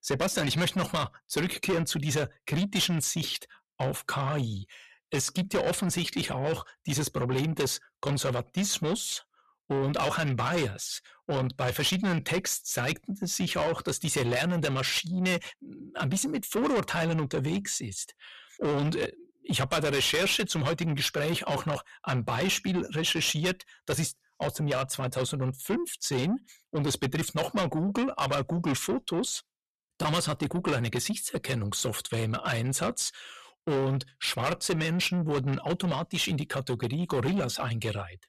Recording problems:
distortion; heavy; 6 dB below the speech

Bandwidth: 14 kHz